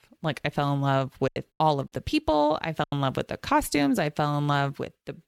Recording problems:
choppy; very; from 1.5 to 3 s; 14% of the speech affected

